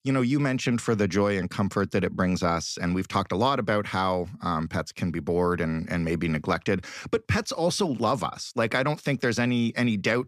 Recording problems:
none

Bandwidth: 14.5 kHz